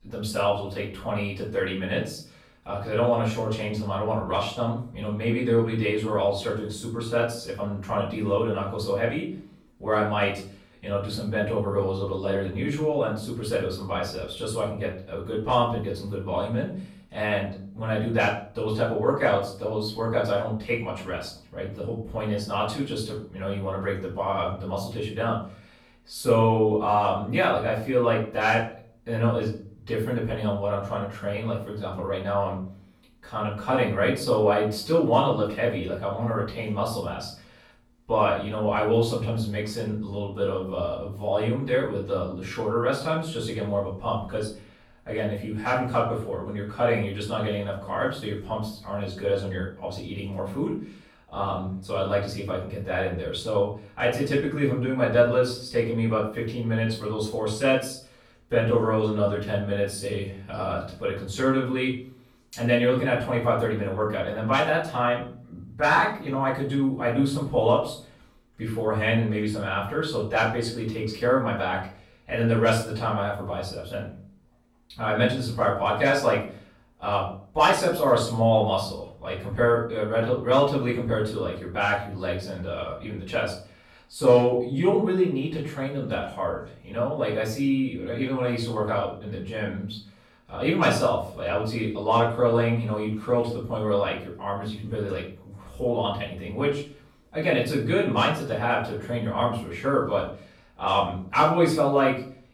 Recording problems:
off-mic speech; far
room echo; noticeable; dies away in 0.4 s

